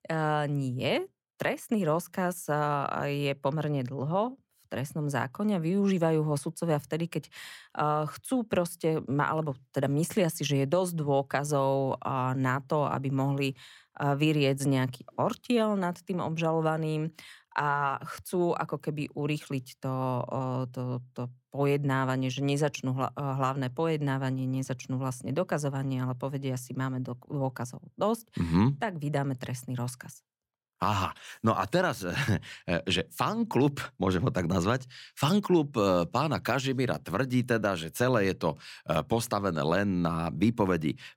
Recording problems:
none

